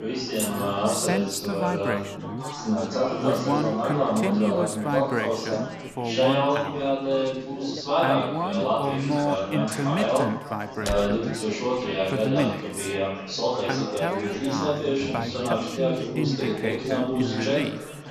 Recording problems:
chatter from many people; very loud; throughout; 3 dB above the speech
jangling keys; noticeable; at 0.5 s; peak 2 dB below the speech
clattering dishes; faint; at 7 s; peak 15 dB below the speech
door banging; noticeable; at 11 s; peak 4 dB below the speech

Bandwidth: 14 kHz